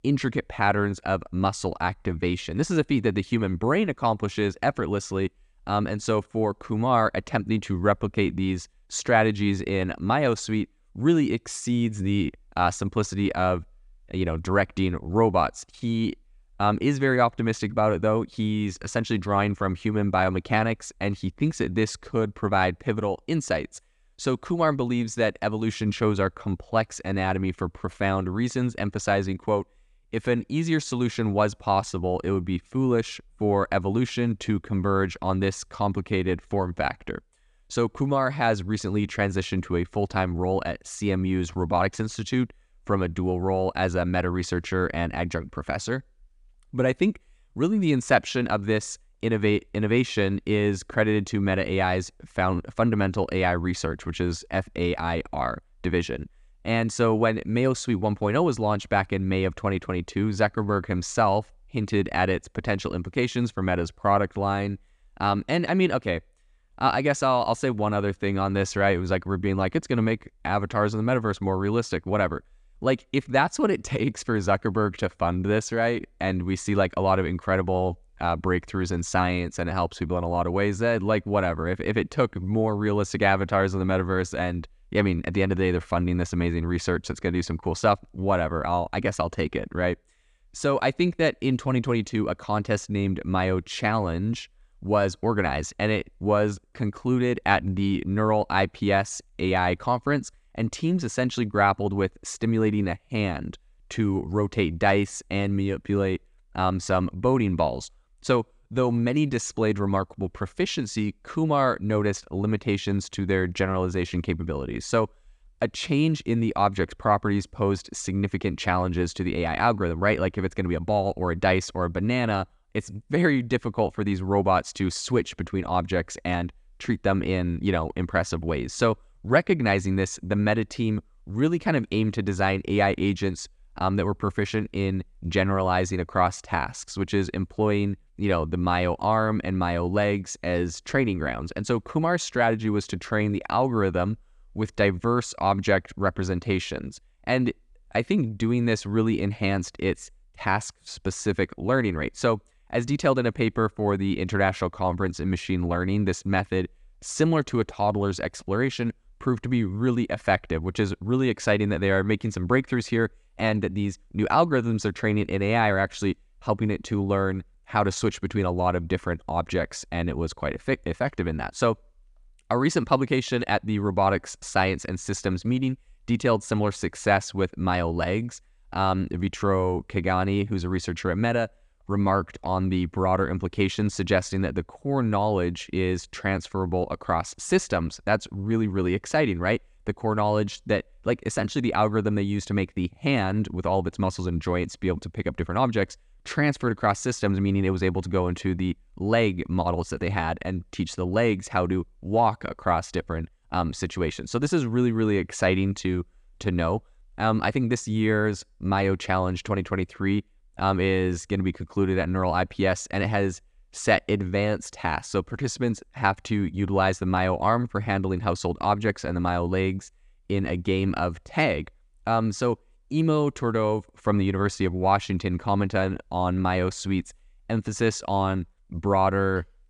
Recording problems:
none

